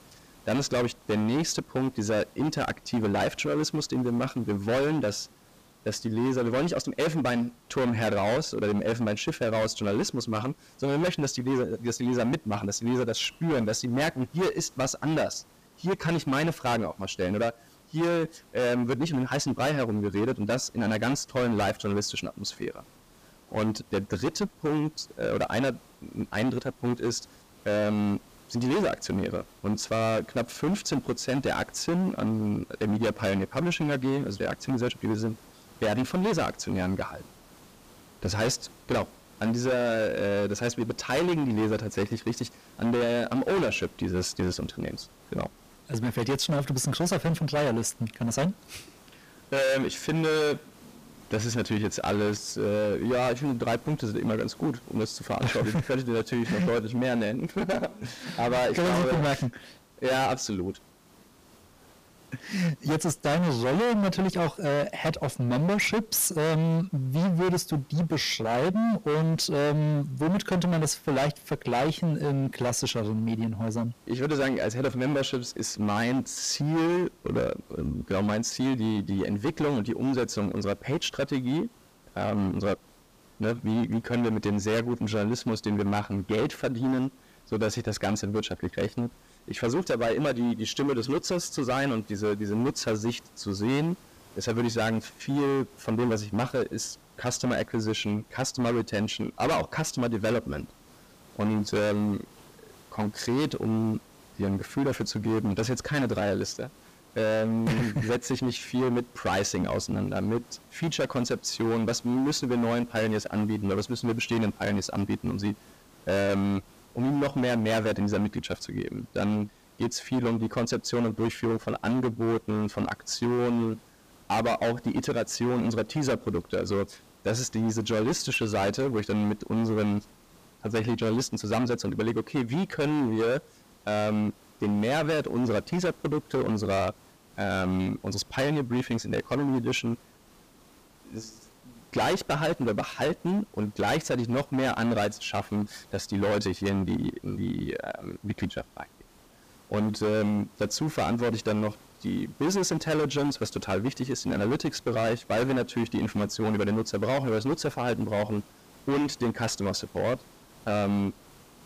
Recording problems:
distortion; heavy; 18% of the sound clipped
hiss; faint; throughout; 25 dB below the speech

